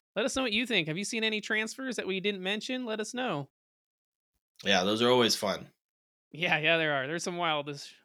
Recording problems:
none

